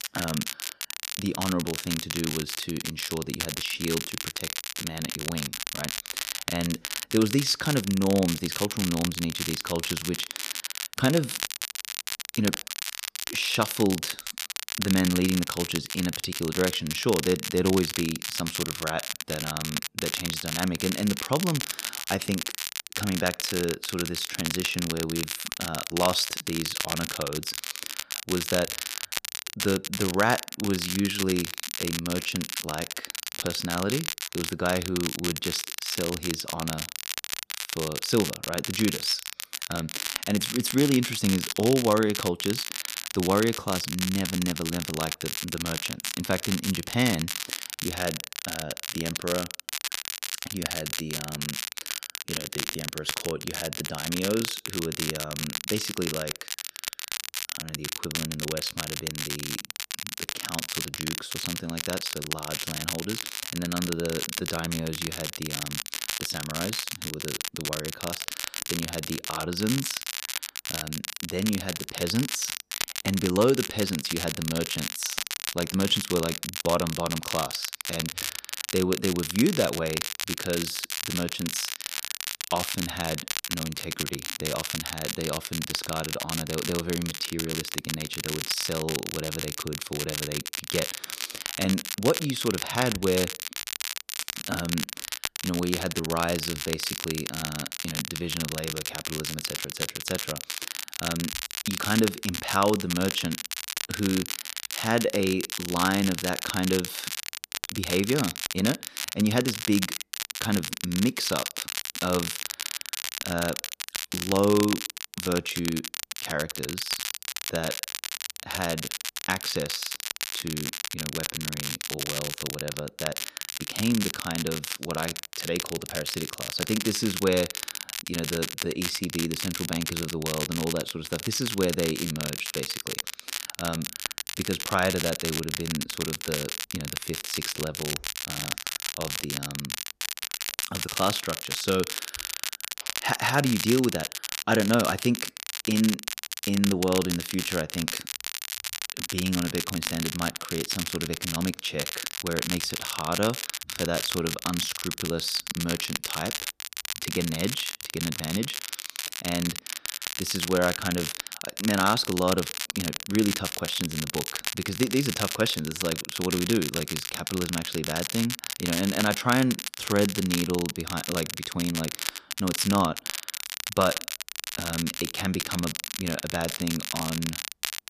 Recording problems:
crackle, like an old record; loud; 2 dB below the speech

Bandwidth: 14.5 kHz